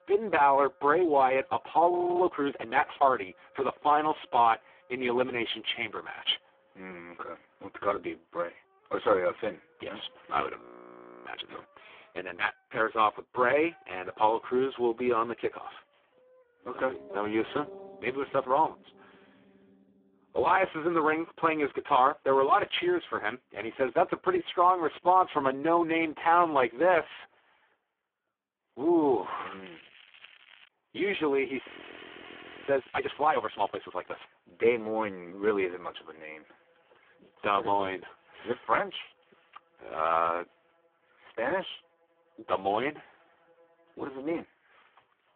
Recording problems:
phone-call audio; poor line
background music; faint; throughout; 30 dB below the speech
crackling; faint; from 29 to 31 s and from 32 to 34 s; 25 dB below the speech
audio freezing; at 2 s, at 11 s for 0.5 s and at 32 s for 1 s

